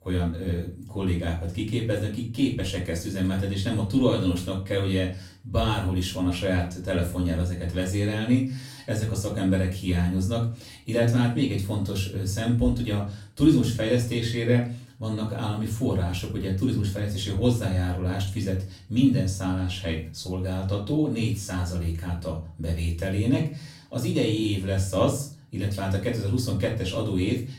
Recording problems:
off-mic speech; far
room echo; slight; dies away in 0.3 s

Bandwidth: 16 kHz